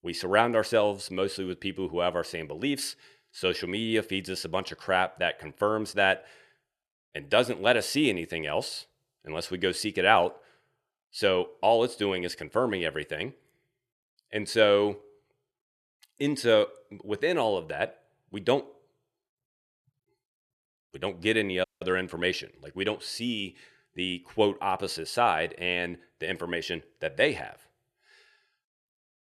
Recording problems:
audio cutting out; at 22 s

